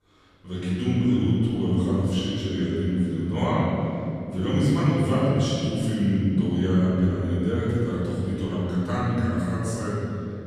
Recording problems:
room echo; strong; dies away in 3 s
off-mic speech; far

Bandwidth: 14 kHz